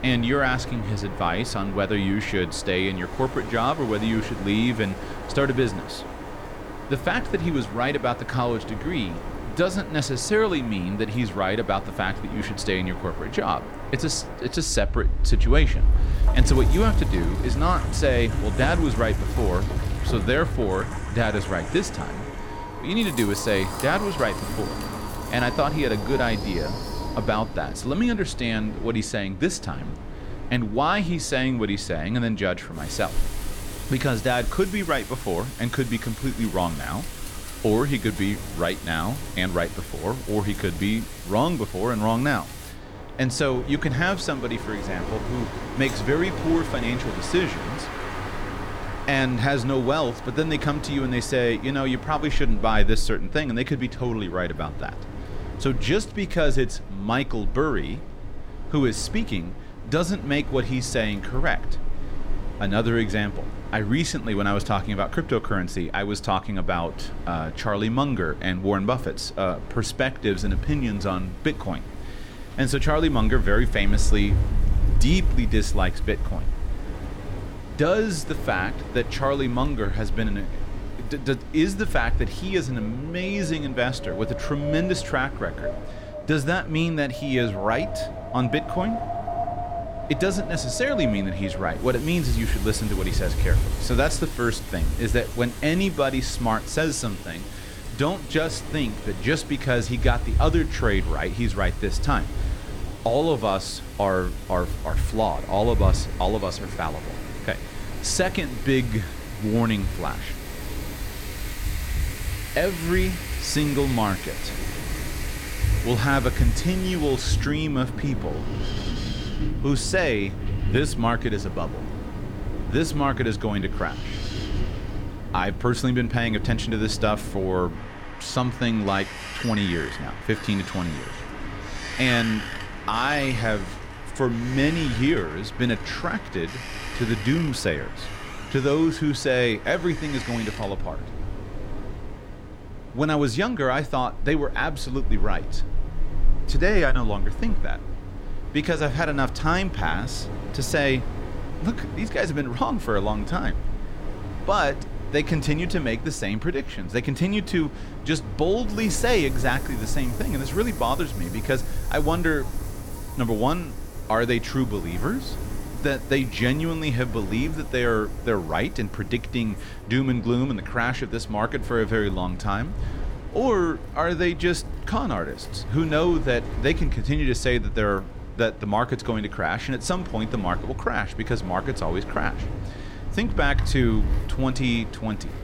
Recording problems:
wind in the background; loud; throughout; 7 dB below the speech

